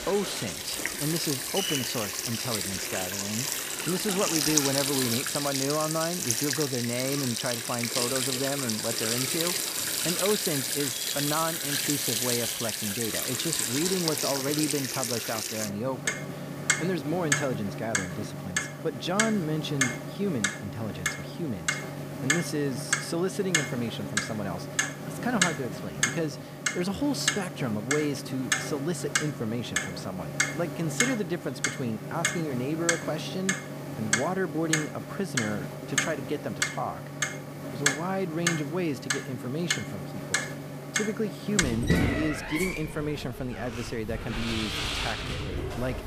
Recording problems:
household noises; very loud; throughout; 2 dB above the speech

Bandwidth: 15 kHz